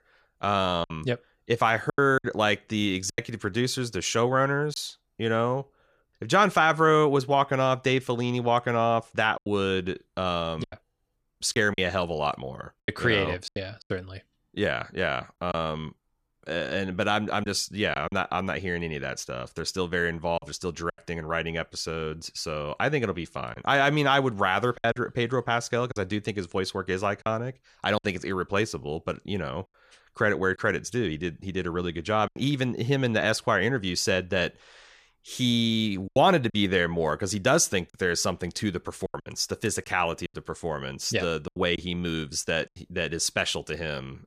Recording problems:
choppy; occasionally; 5% of the speech affected

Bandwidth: 14.5 kHz